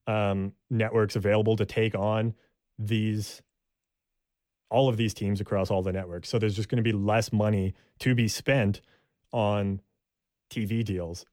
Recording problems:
none

